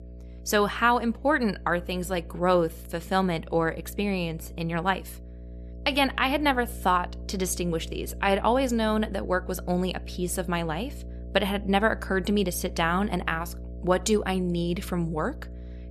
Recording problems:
electrical hum; faint; throughout; 60 Hz, 25 dB below the speech

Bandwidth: 13.5 kHz